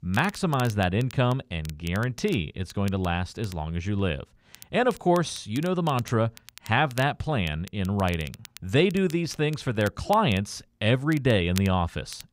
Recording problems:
crackle, like an old record; noticeable; 20 dB below the speech

